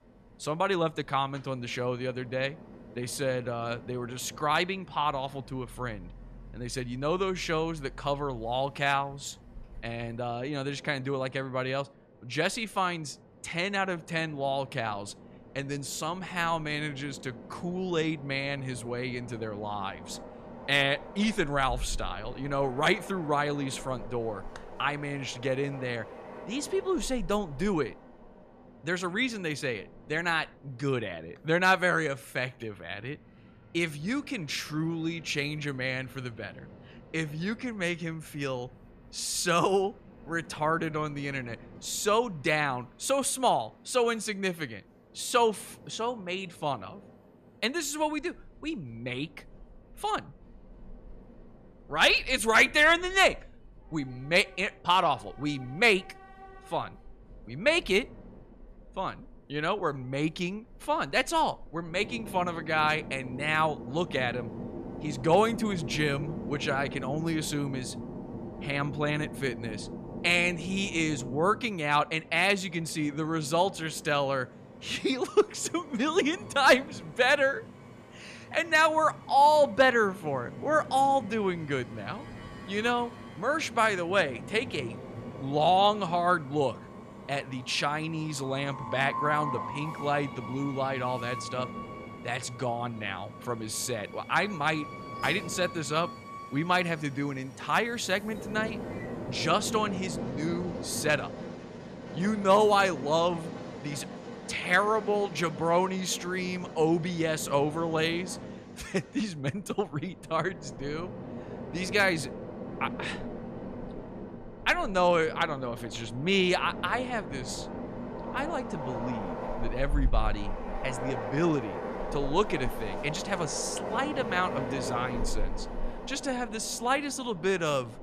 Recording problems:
train or aircraft noise; noticeable; throughout; 10 dB below the speech

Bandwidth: 14.5 kHz